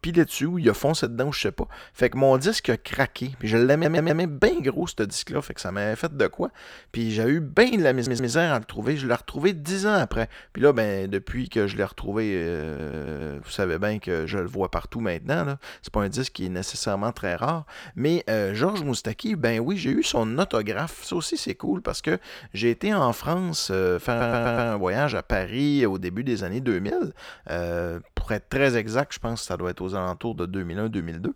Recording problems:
audio stuttering; 4 times, first at 3.5 s

